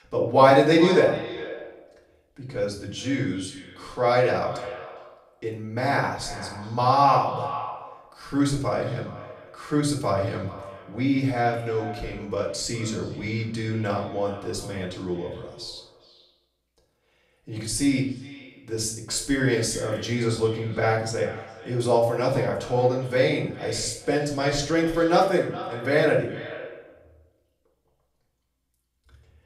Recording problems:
off-mic speech; far
echo of what is said; noticeable; throughout; 410 ms later, 15 dB below the speech
room echo; slight; dies away in 0.5 s

